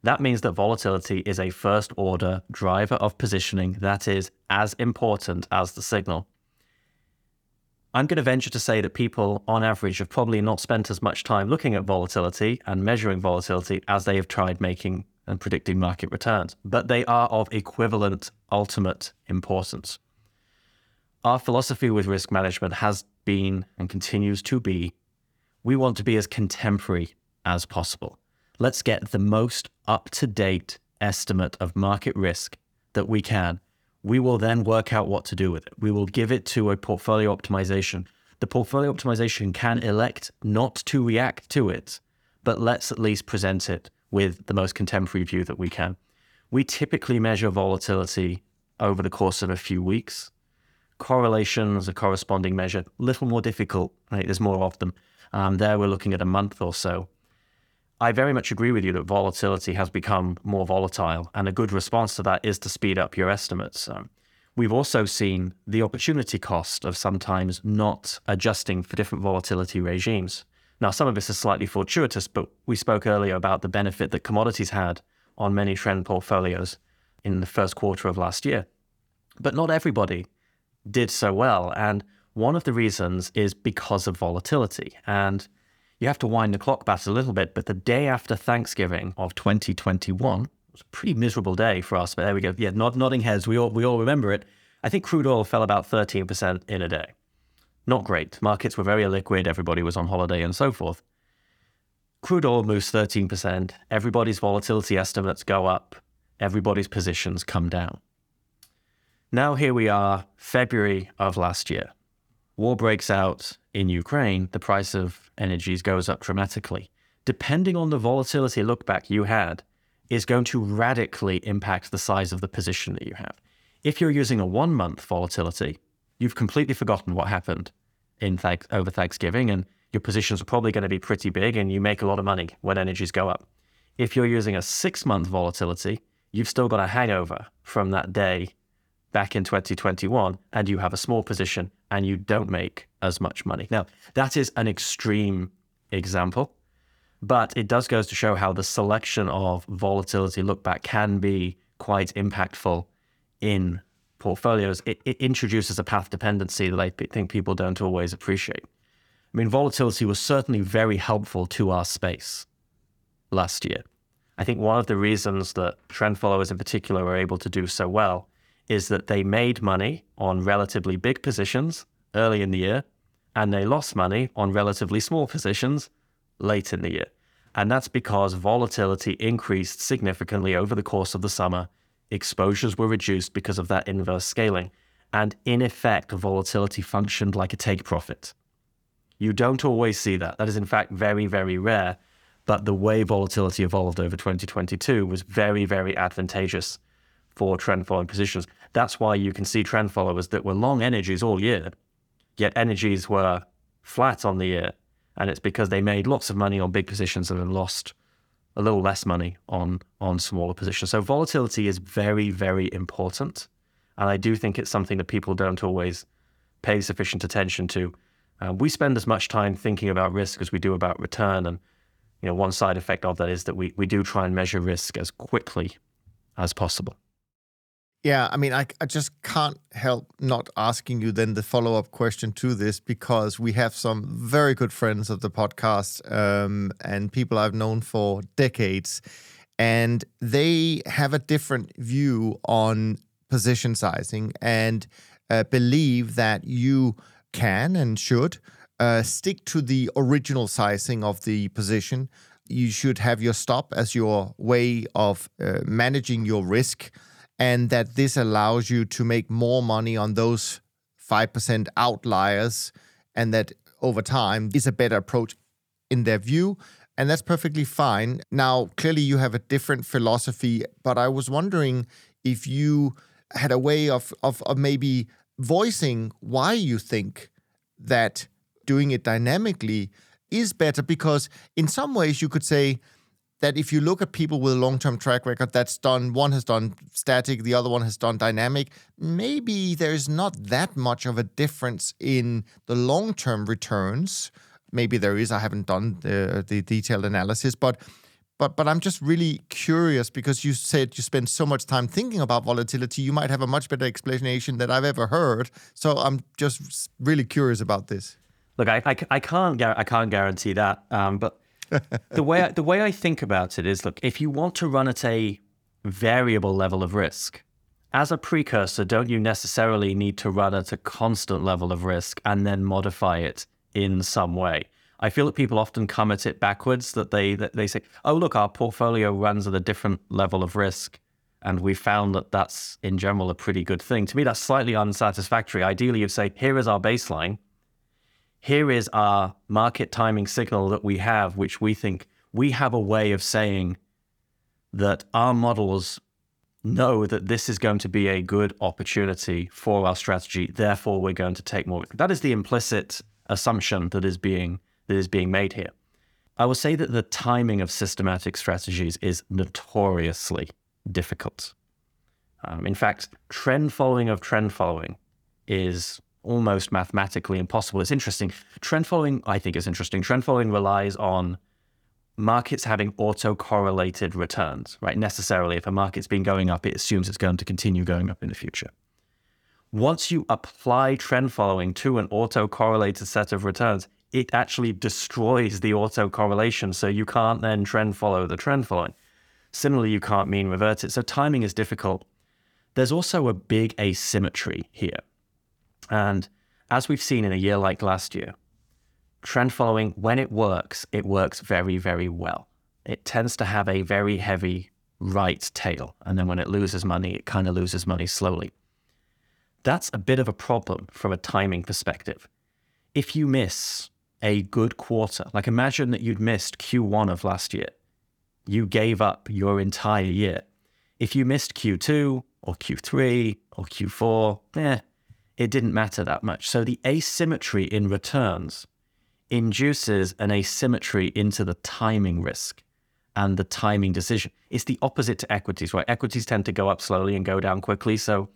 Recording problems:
none

